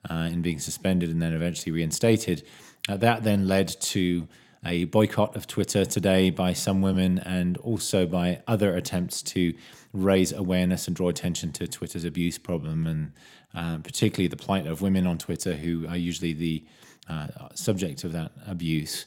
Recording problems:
uneven, jittery; strongly; from 1 to 17 s

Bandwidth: 16.5 kHz